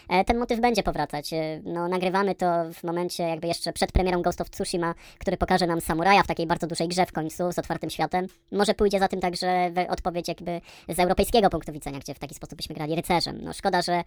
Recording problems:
wrong speed and pitch; too fast and too high; 1.5 times normal speed

